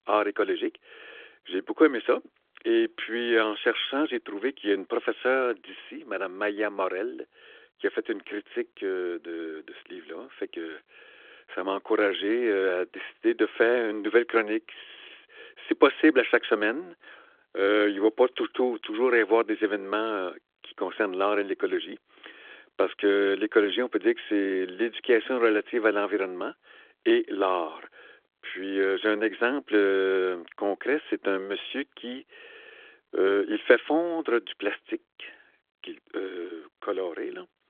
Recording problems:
phone-call audio; nothing above 3.5 kHz

